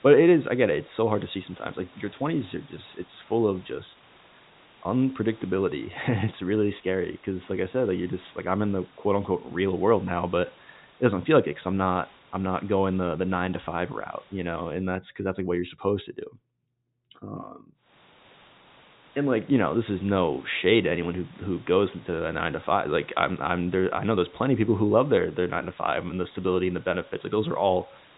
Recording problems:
high frequencies cut off; severe; nothing above 4 kHz
hiss; faint; until 15 s and from 18 s on; 25 dB below the speech

